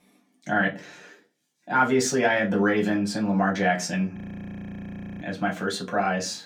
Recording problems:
off-mic speech; far
room echo; very slight; dies away in 0.2 s
audio freezing; at 4 s for 1 s

